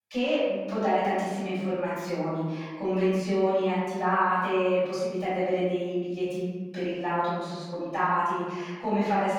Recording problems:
room echo; strong; dies away in 1.3 s
off-mic speech; far

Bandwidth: 18.5 kHz